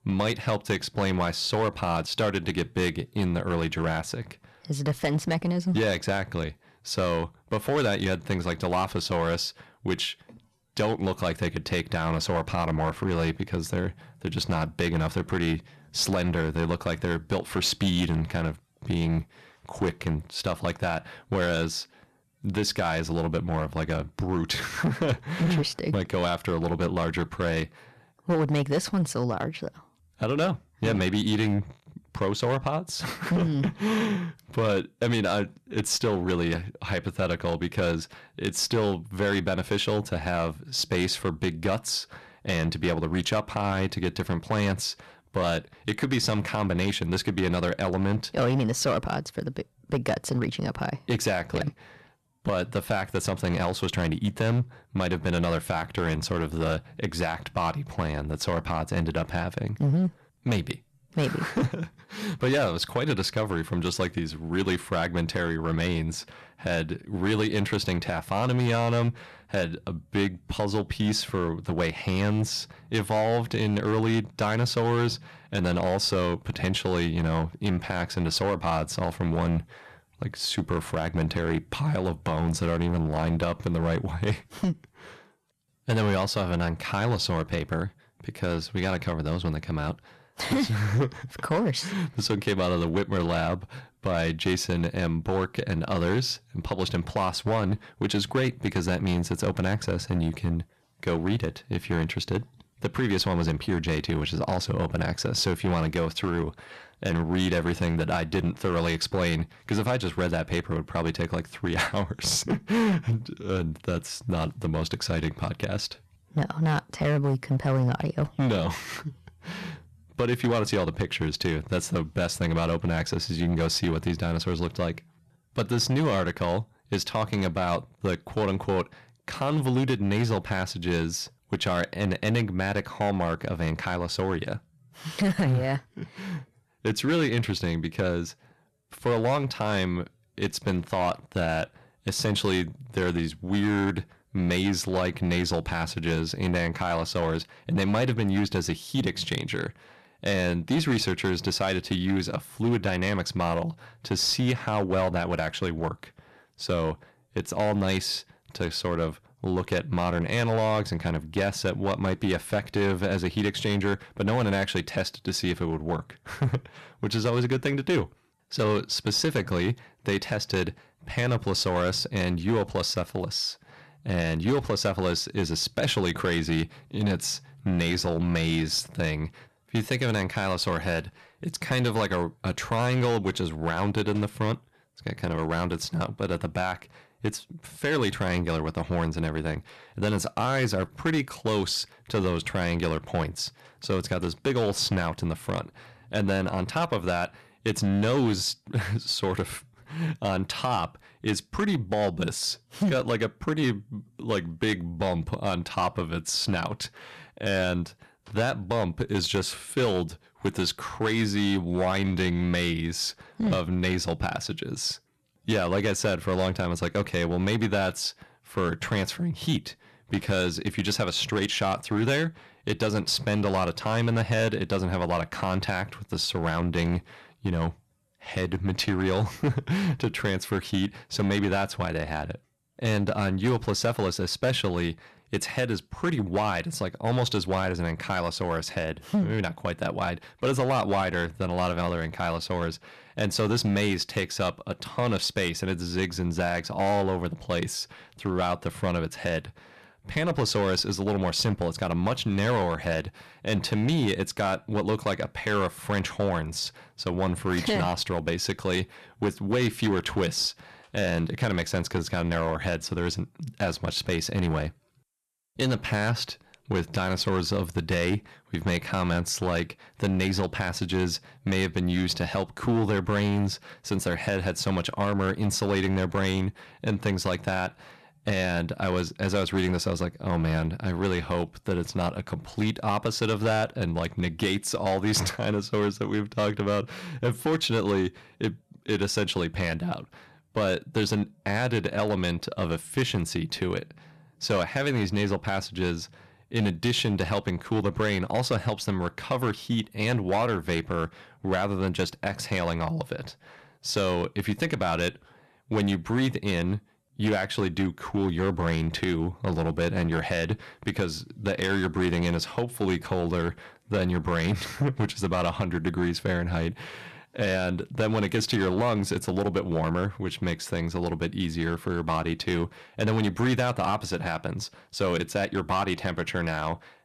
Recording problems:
distortion; slight; 7% of the sound clipped

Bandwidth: 13.5 kHz